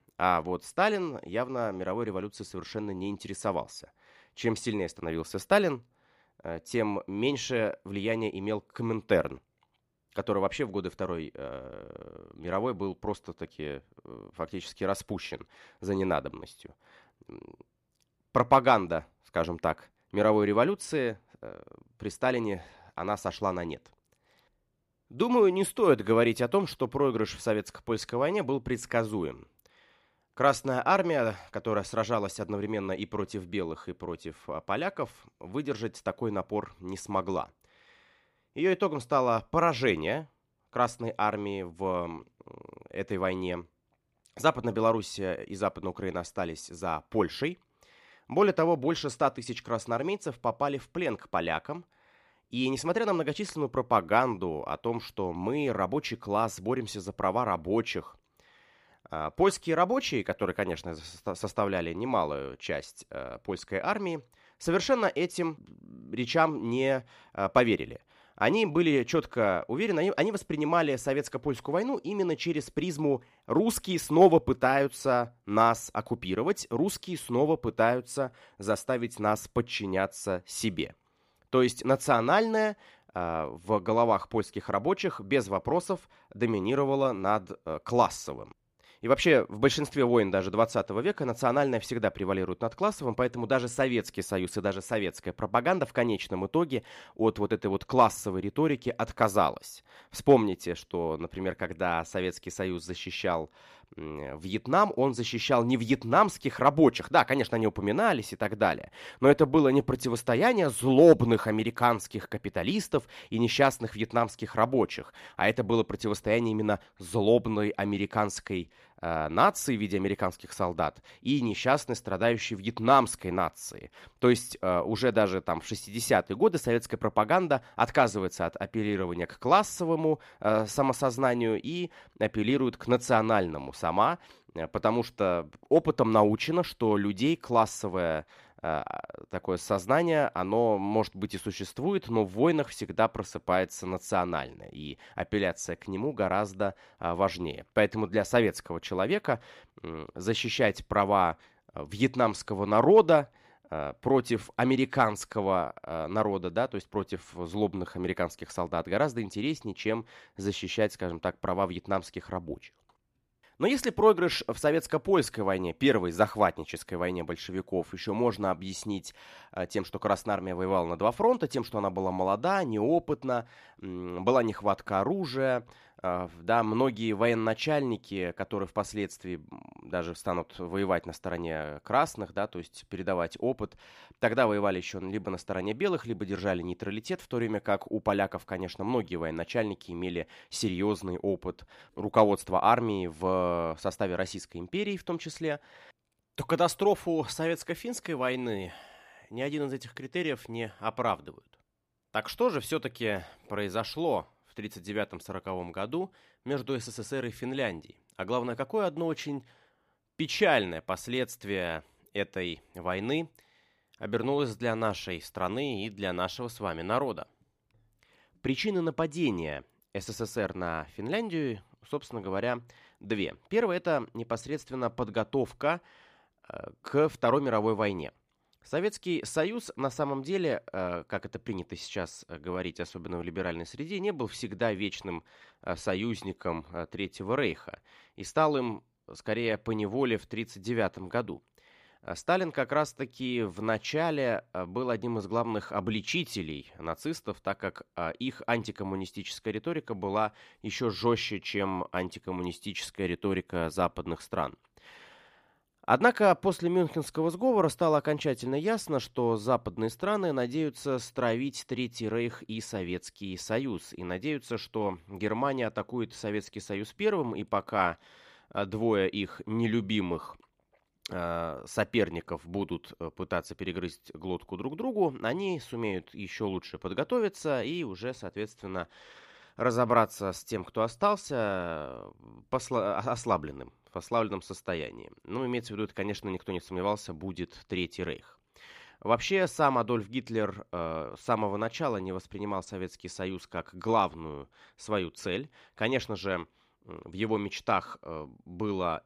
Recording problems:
none

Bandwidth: 15 kHz